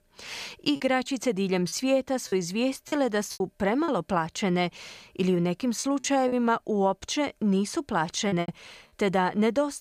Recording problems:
choppy; very; from 1 to 4 s, at 6 s and at 8.5 s; 8% of the speech affected

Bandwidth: 15 kHz